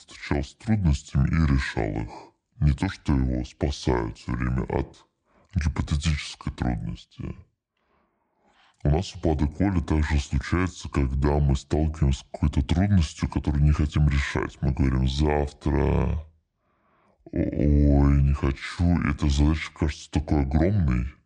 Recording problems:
wrong speed and pitch; too slow and too low; 0.7 times normal speed

